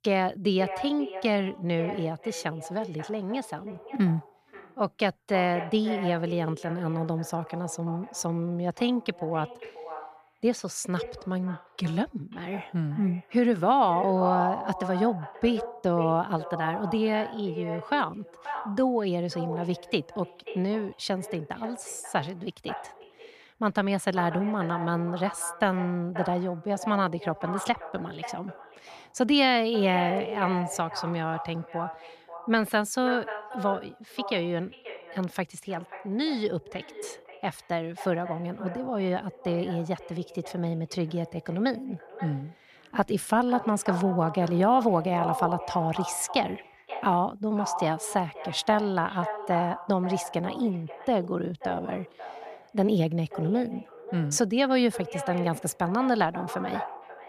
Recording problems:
echo of what is said; strong; throughout; 530 ms later, 10 dB below the speech

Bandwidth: 14.5 kHz